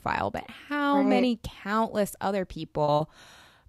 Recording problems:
choppy; occasionally; at 3 s; 4% of the speech affected

